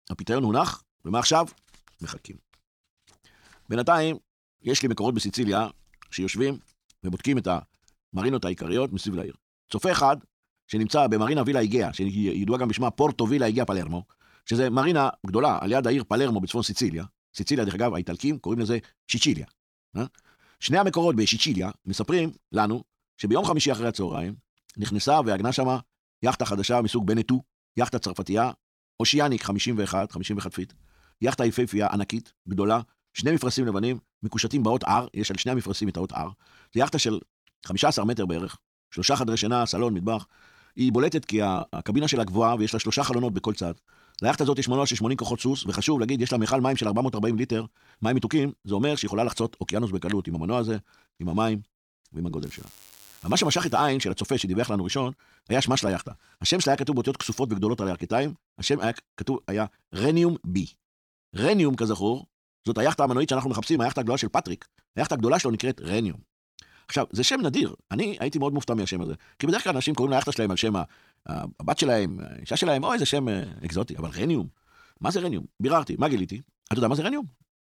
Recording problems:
wrong speed, natural pitch; too fast; 1.5 times normal speed

